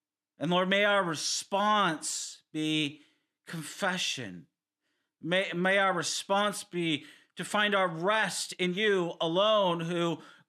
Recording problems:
uneven, jittery; strongly; from 1.5 to 10 s

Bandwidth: 13.5 kHz